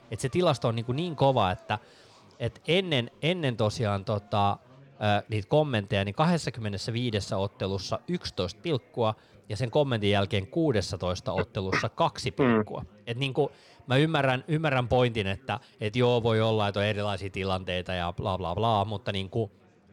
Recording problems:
chatter from many people; faint; throughout; 30 dB below the speech

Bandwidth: 17 kHz